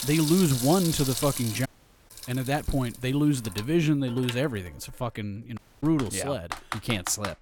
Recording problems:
household noises; loud; throughout; 8 dB below the speech
audio cutting out; at 1.5 s and at 5.5 s

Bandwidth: 18 kHz